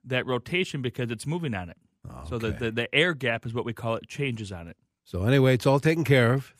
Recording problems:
none

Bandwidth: 15 kHz